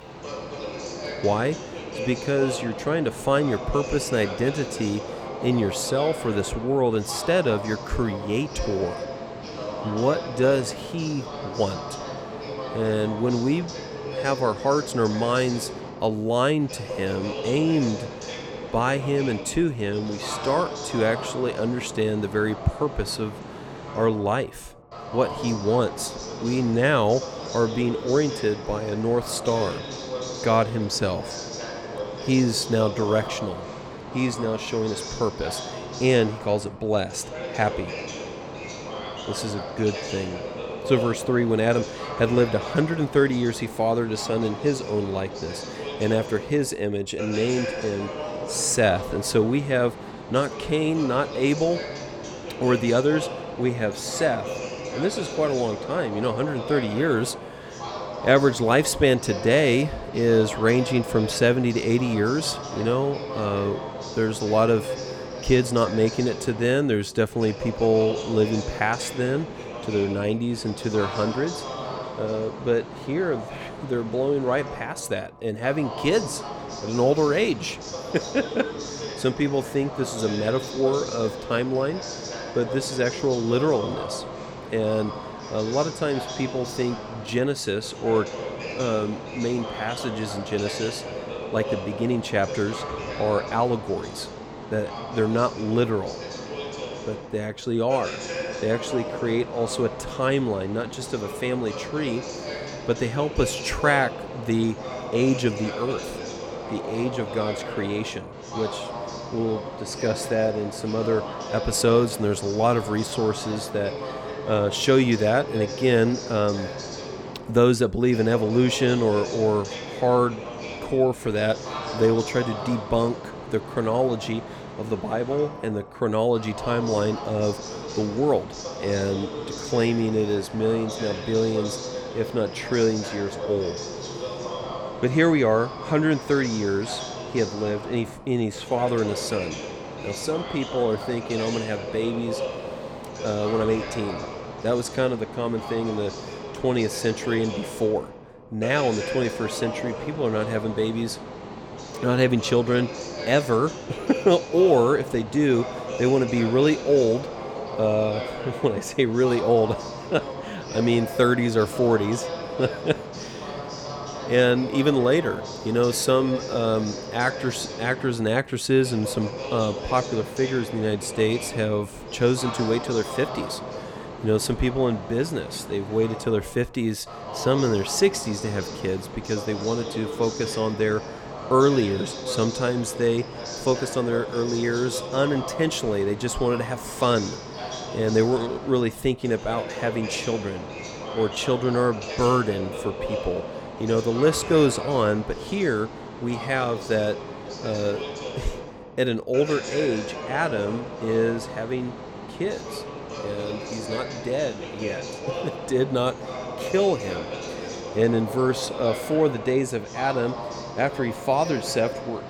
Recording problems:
voice in the background; loud; throughout; 9 dB below the speech

